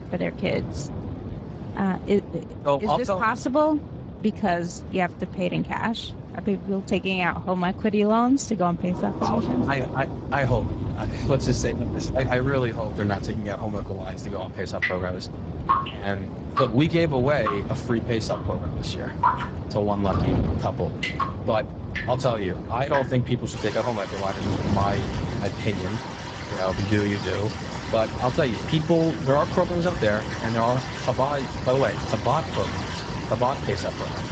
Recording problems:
garbled, watery; badly; nothing above 7.5 kHz
rain or running water; loud; from 9 s on; 7 dB below the speech
wind noise on the microphone; occasional gusts; 15 dB below the speech

